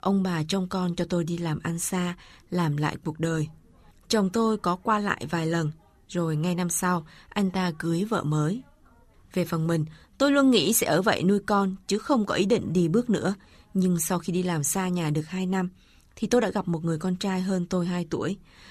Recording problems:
none

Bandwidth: 14 kHz